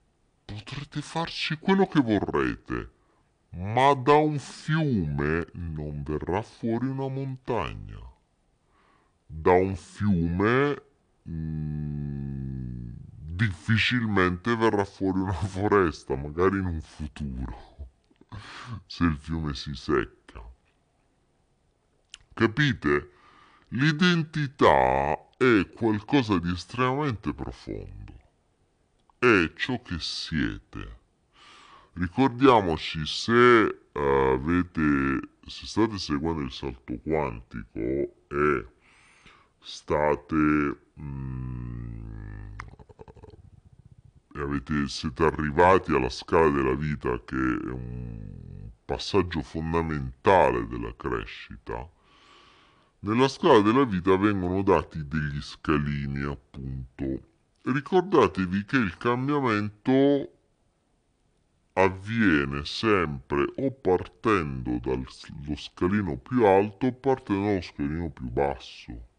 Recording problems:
wrong speed and pitch; too slow and too low; 0.6 times normal speed

